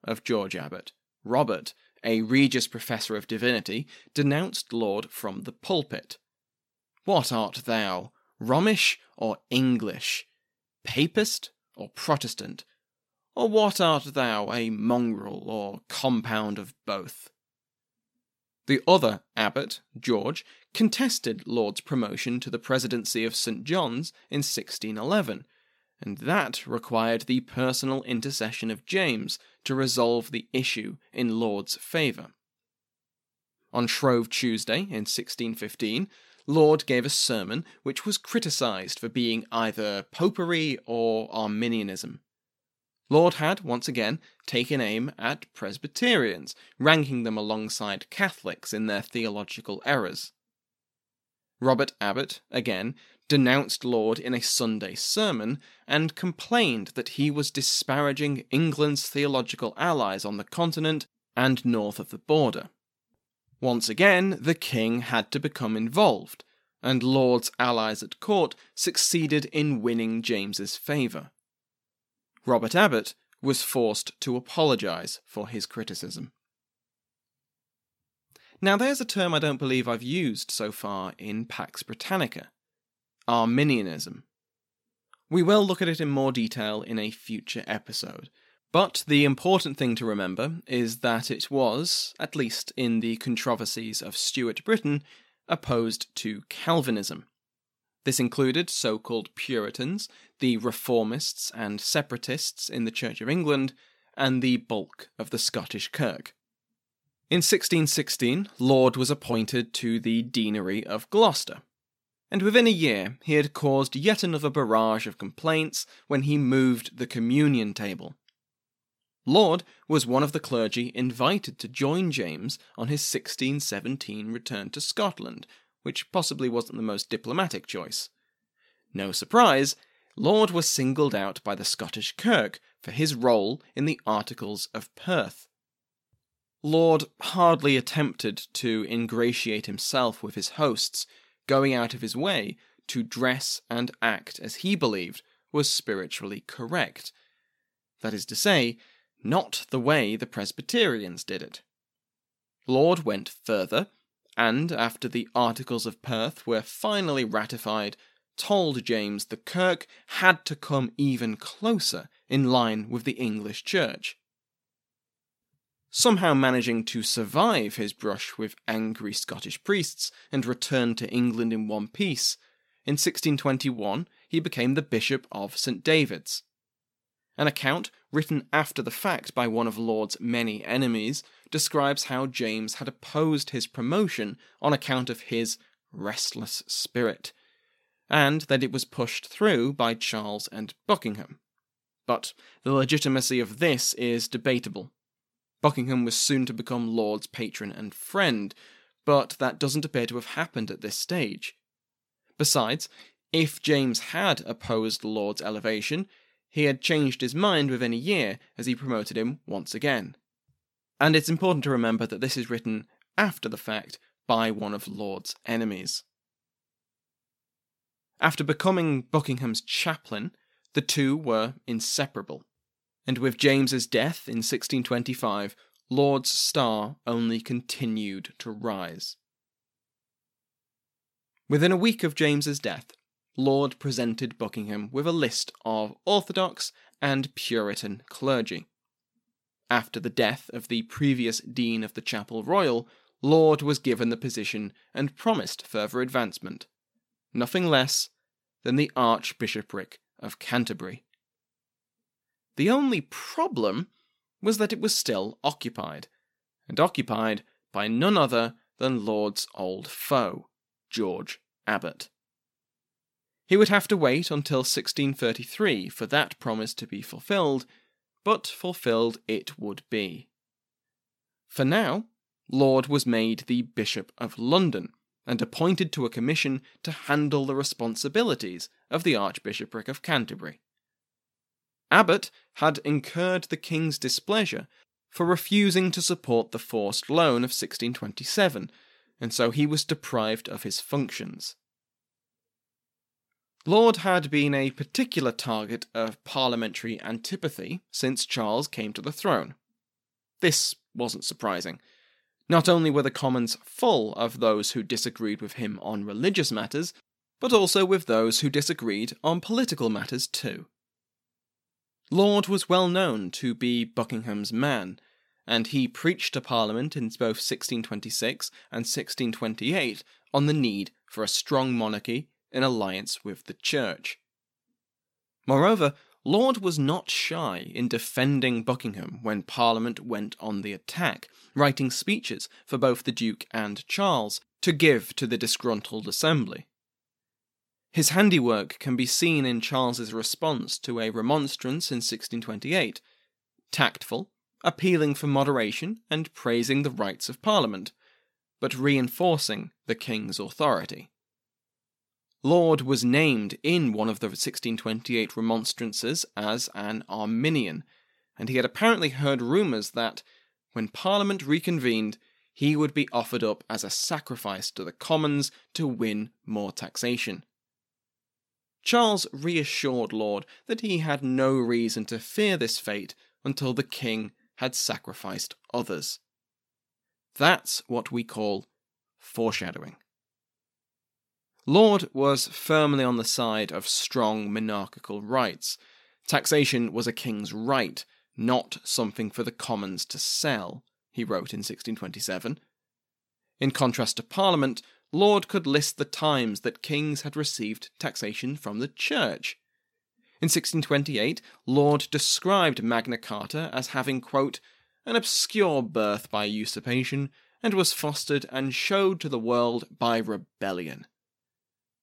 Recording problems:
none

